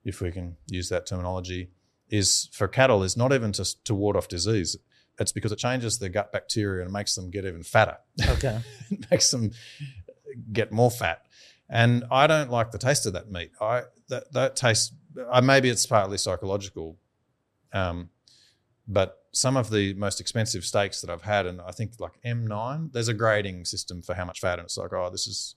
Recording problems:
uneven, jittery; strongly; from 5 to 25 s

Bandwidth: 13.5 kHz